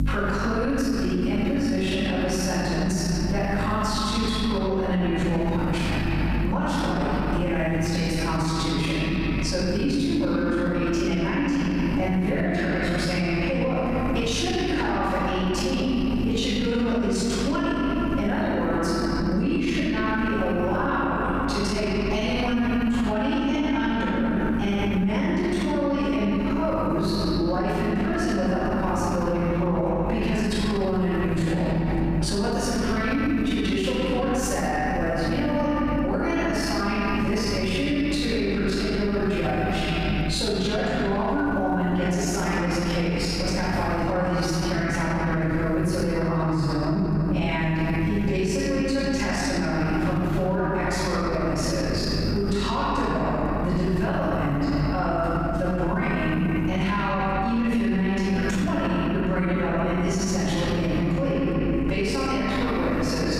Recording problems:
room echo; strong; dies away in 3 s
off-mic speech; far
squashed, flat; somewhat
electrical hum; noticeable; throughout; 50 Hz, 20 dB below the speech

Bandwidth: 14.5 kHz